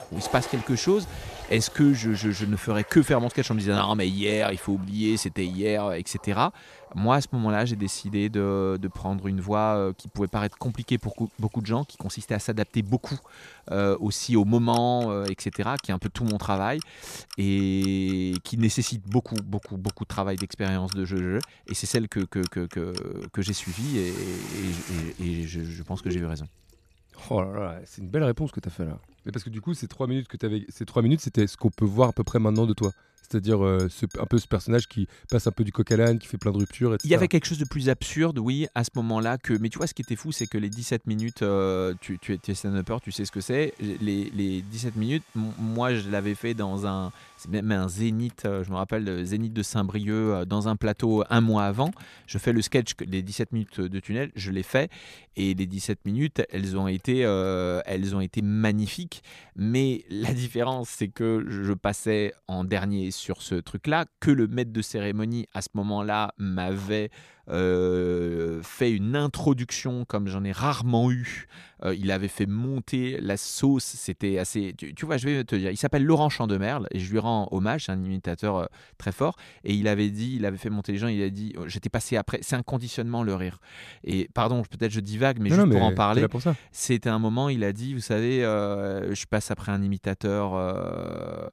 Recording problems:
household noises; noticeable; until 1:02; 15 dB below the speech

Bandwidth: 14.5 kHz